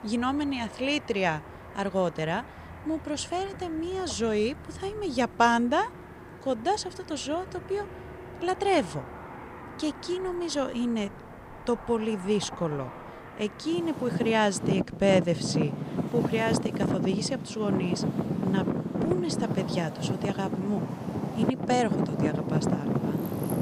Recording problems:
traffic noise; loud; throughout; 3 dB below the speech

